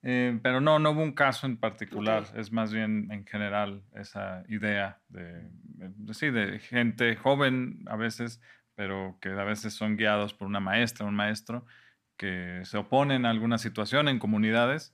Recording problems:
none

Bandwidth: 14.5 kHz